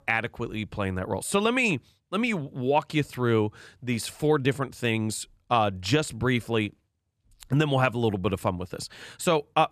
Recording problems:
none

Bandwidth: 14 kHz